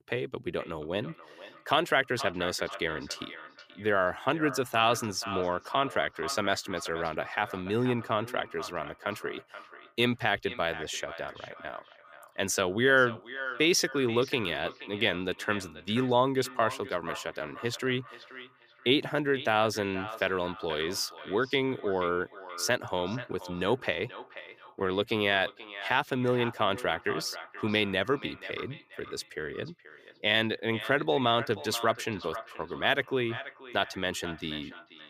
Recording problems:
echo of what is said; noticeable; throughout; 480 ms later, 15 dB below the speech

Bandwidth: 15 kHz